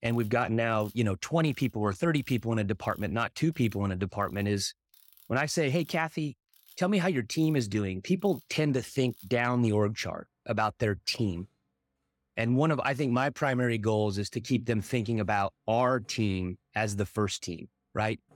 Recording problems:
machinery noise; faint; throughout; 30 dB below the speech

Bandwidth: 17 kHz